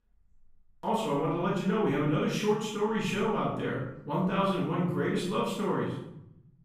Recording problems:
off-mic speech; far
room echo; noticeable; dies away in 0.8 s

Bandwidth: 15 kHz